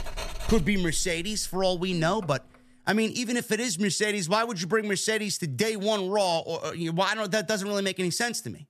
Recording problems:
household noises; noticeable; until 2 s; 15 dB below the speech

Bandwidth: 13.5 kHz